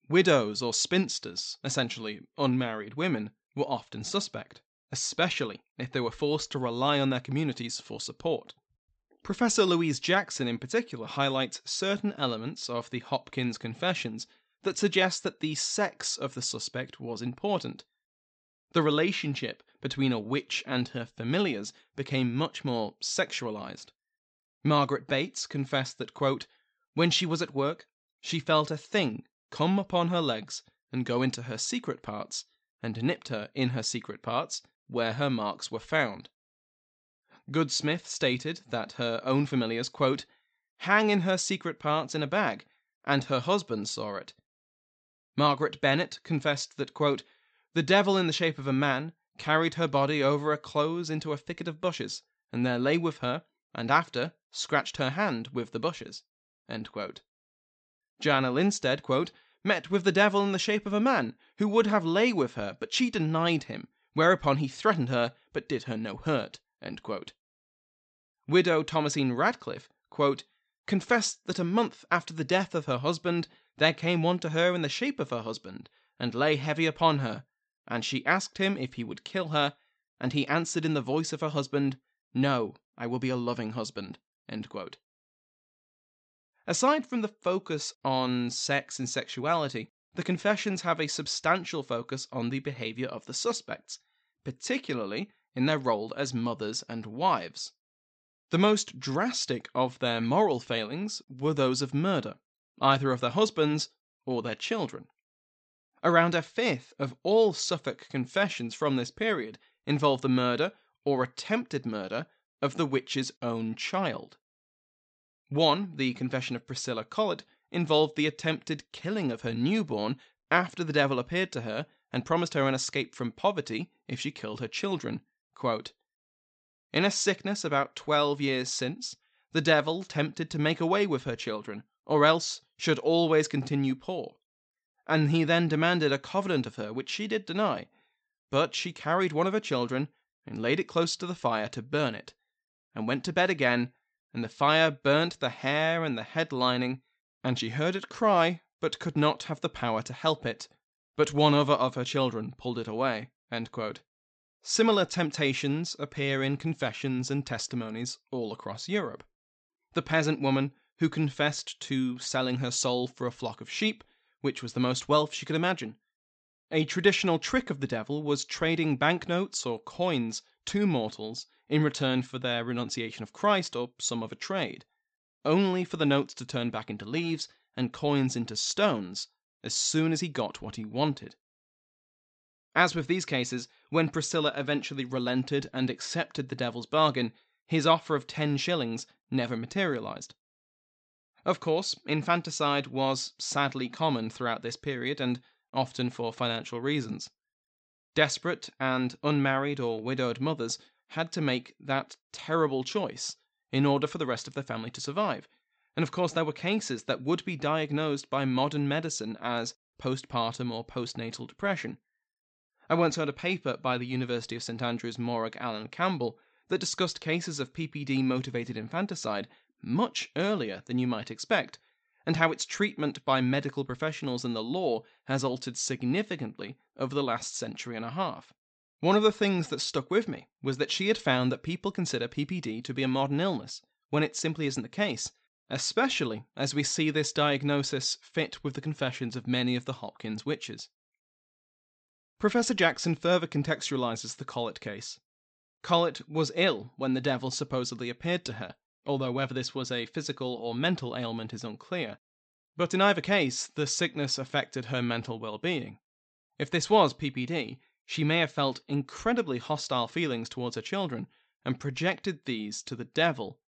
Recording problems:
high frequencies cut off; noticeable; nothing above 8 kHz

